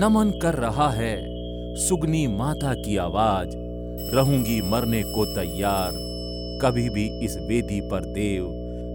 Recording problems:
electrical hum; noticeable; throughout; 60 Hz, 10 dB below the speech
alarms or sirens; noticeable; throughout; 10 dB below the speech
abrupt cut into speech; at the start

